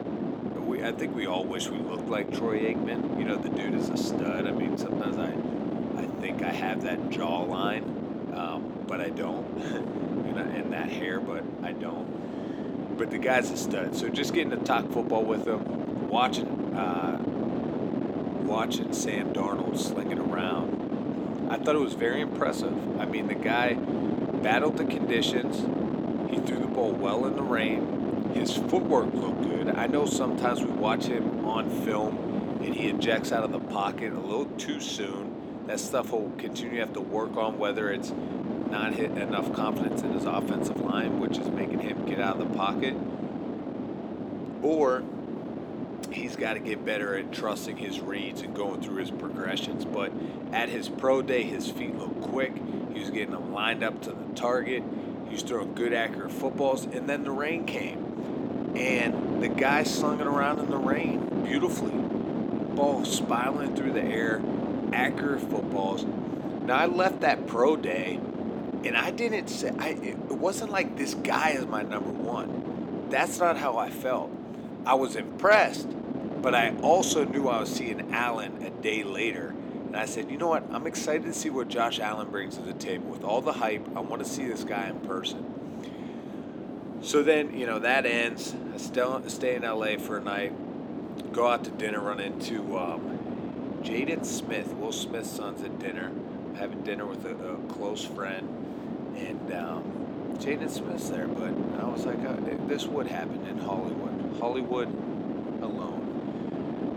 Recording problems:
thin; somewhat; fading below 300 Hz
wind noise on the microphone; heavy; 6 dB below the speech

